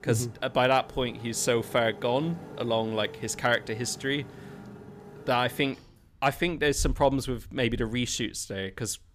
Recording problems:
traffic noise; noticeable; throughout; 15 dB below the speech

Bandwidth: 15 kHz